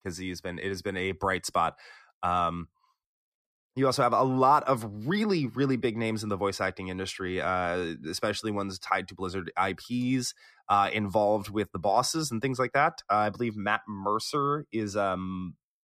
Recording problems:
none

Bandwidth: 14.5 kHz